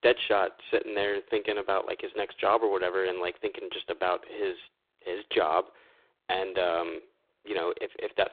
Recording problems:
phone-call audio; poor line

